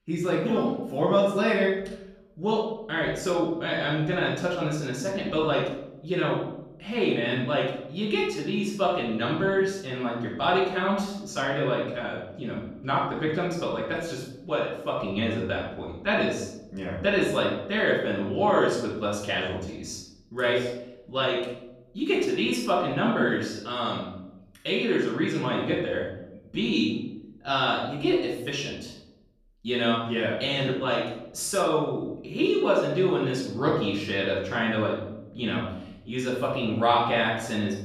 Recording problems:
off-mic speech; far
room echo; noticeable; dies away in 0.8 s

